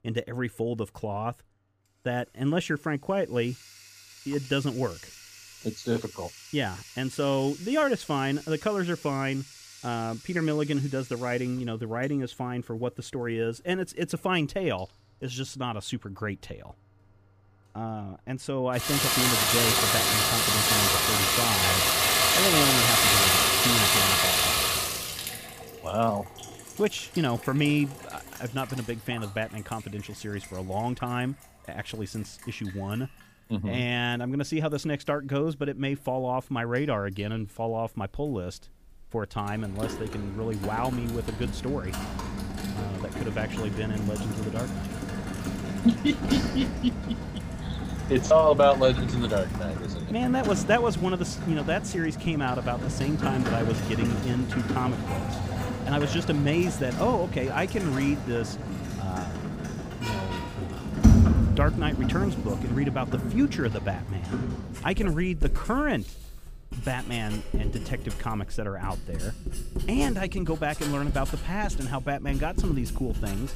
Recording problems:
household noises; very loud; throughout; 3 dB above the speech

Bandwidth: 15 kHz